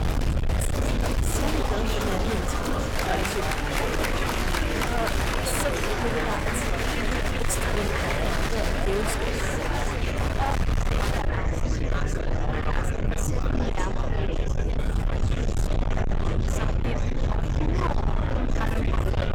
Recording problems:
distortion; heavy; 32% of the sound clipped
murmuring crowd; very loud; throughout; 5 dB above the speech
low rumble; loud; throughout; 4 dB below the speech

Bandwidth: 18 kHz